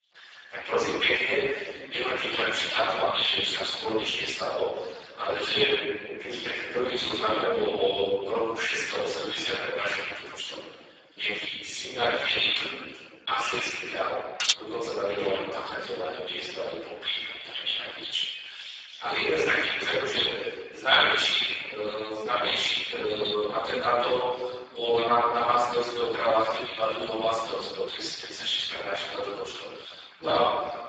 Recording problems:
room echo; strong; dies away in 1.8 s
off-mic speech; far
garbled, watery; badly; nothing above 7.5 kHz
thin; very; fading below 450 Hz
clattering dishes; loud; at 14 s; peak 2 dB above the speech

